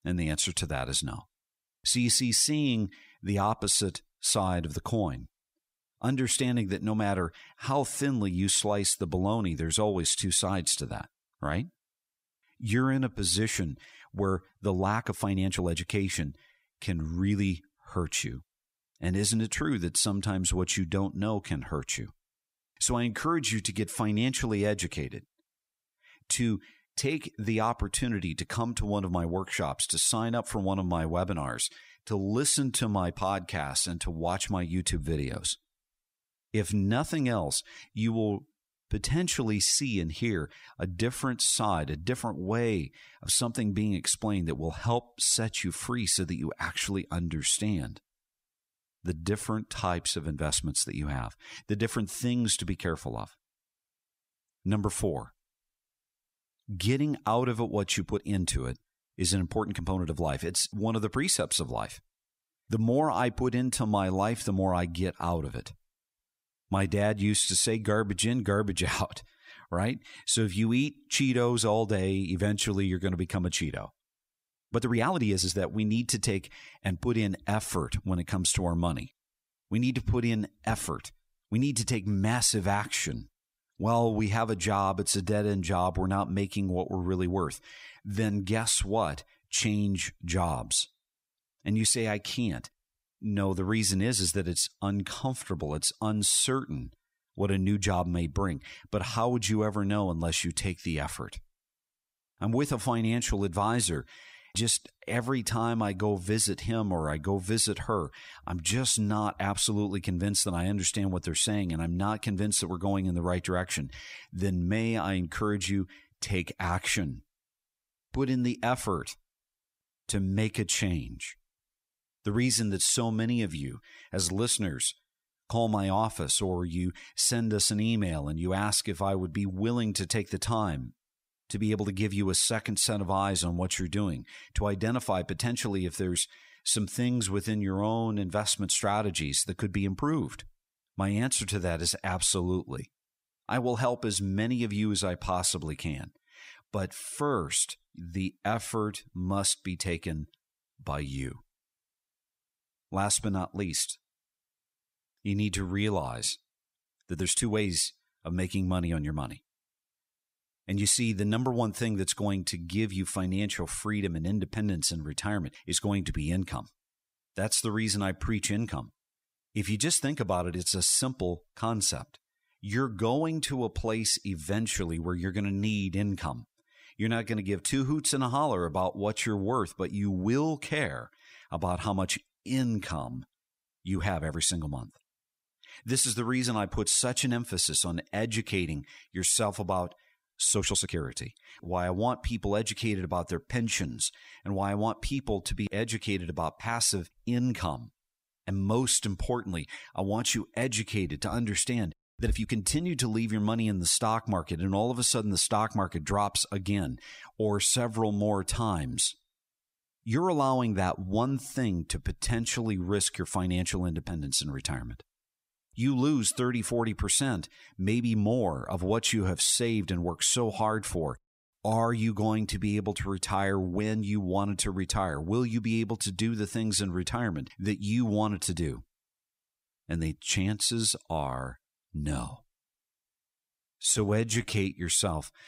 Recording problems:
uneven, jittery; strongly; from 15 s to 3:55

